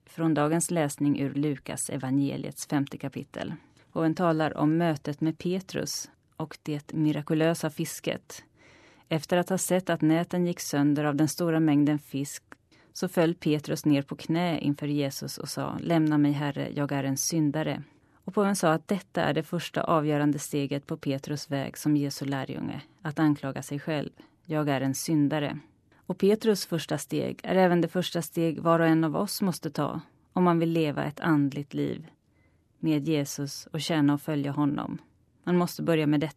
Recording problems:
none

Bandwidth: 13.5 kHz